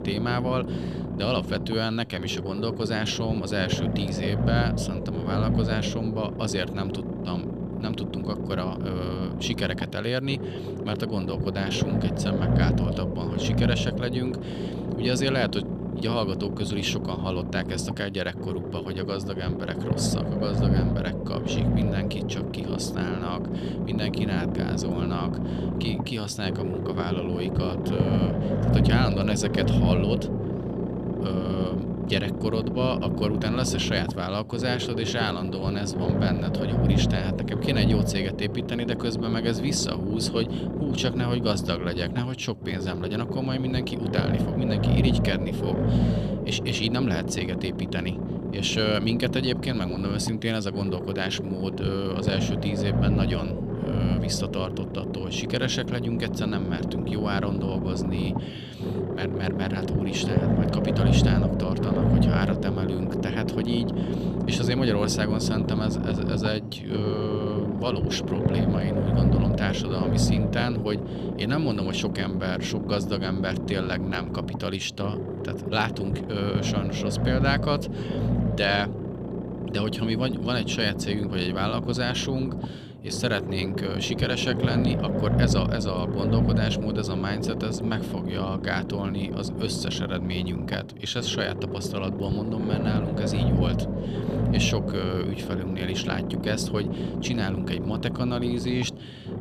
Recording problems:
low rumble; loud; throughout; 3 dB below the speech

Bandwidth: 14.5 kHz